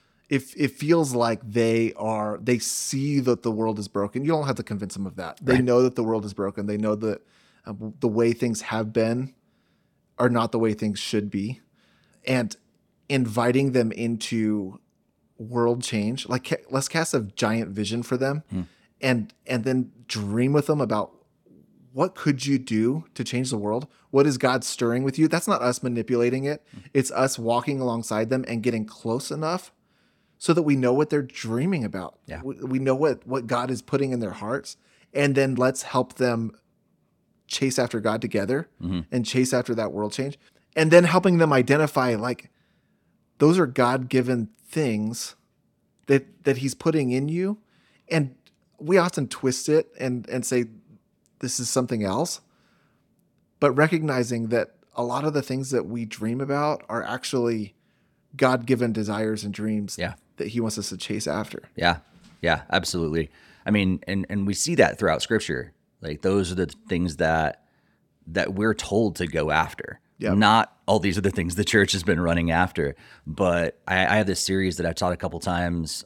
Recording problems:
none

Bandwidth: 17 kHz